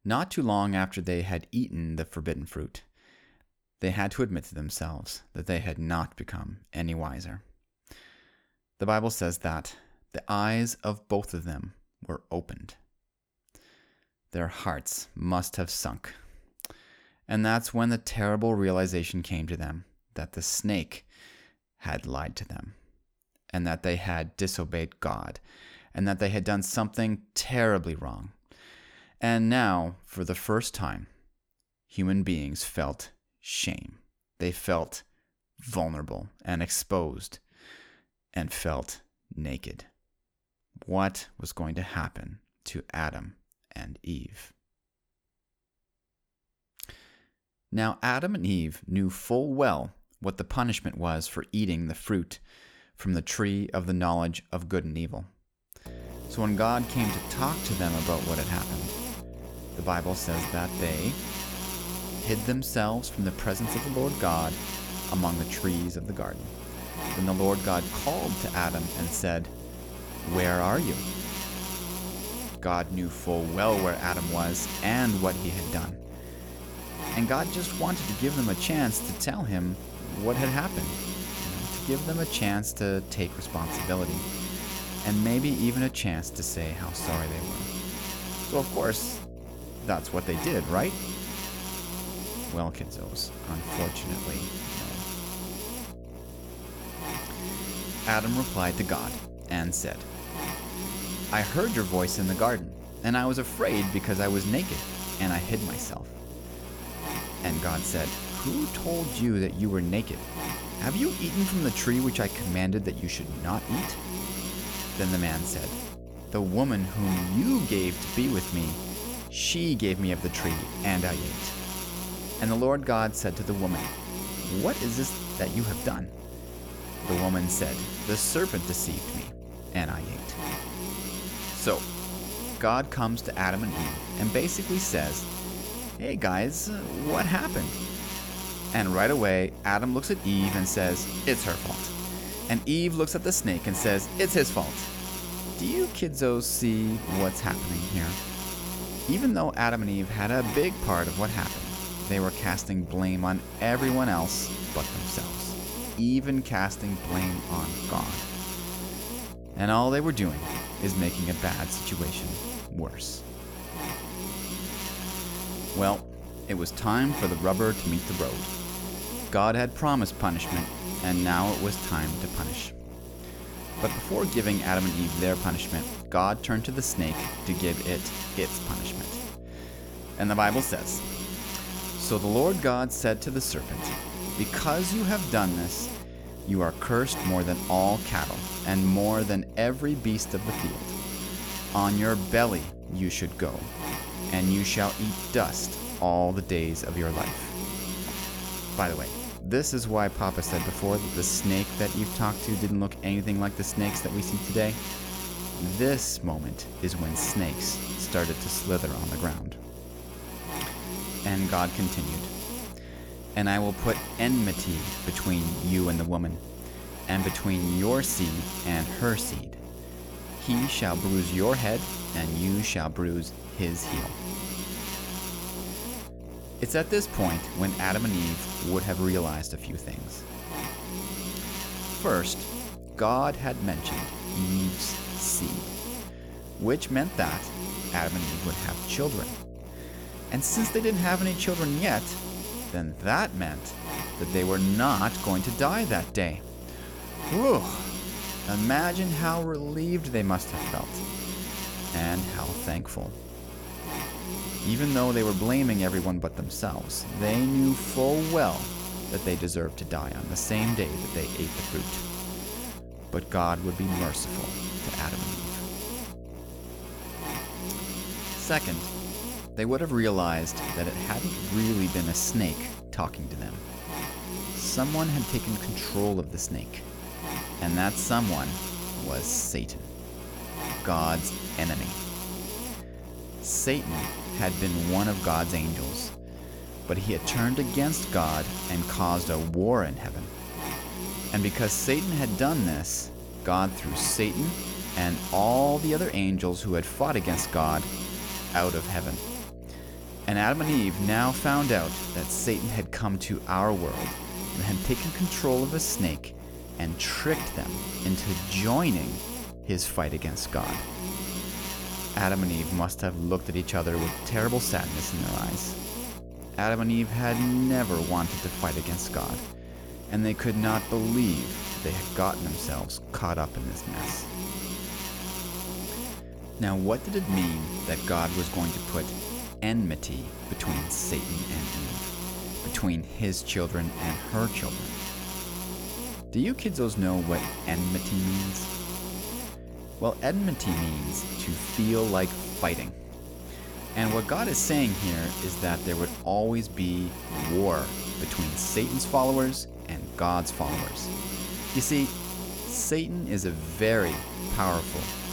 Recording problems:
electrical hum; loud; from 56 s on; 60 Hz, 7 dB below the speech

